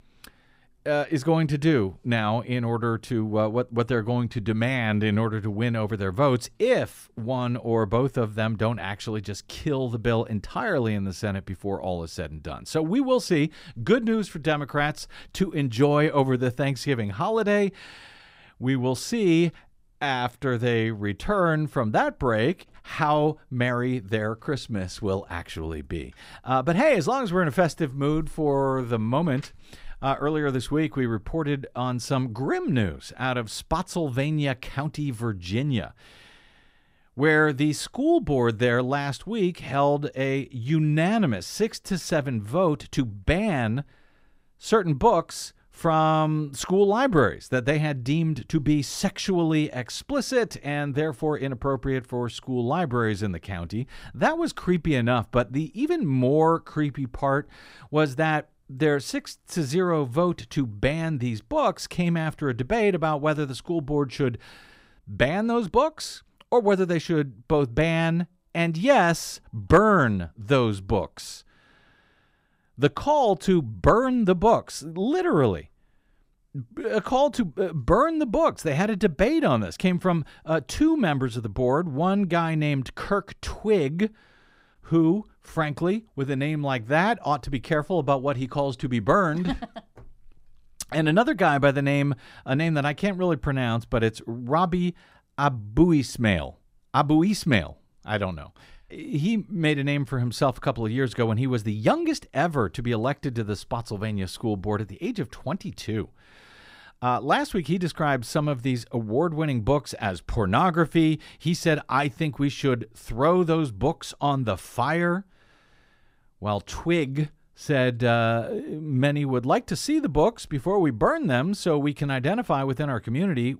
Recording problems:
none

